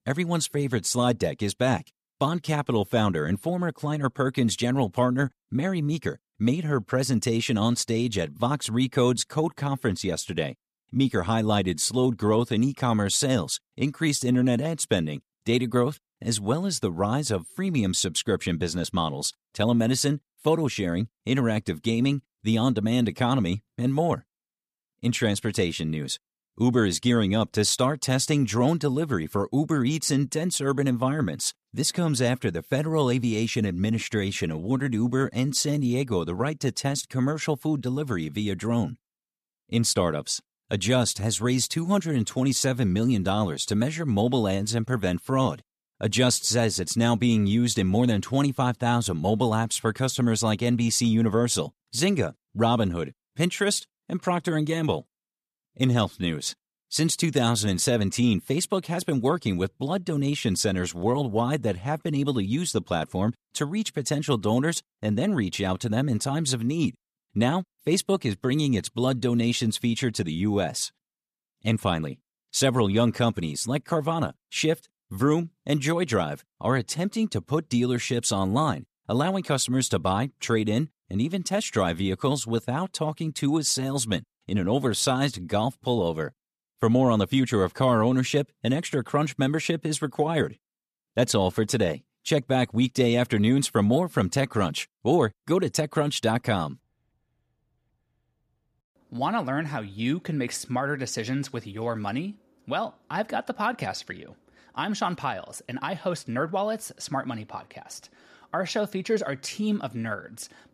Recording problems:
none

